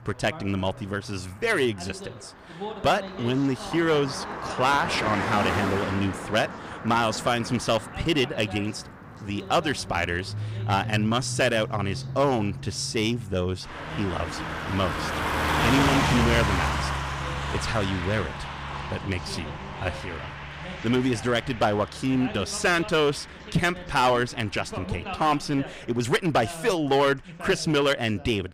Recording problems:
distortion; slight; 4% of the sound clipped
traffic noise; loud; throughout; 5 dB below the speech
voice in the background; noticeable; throughout; 15 dB below the speech

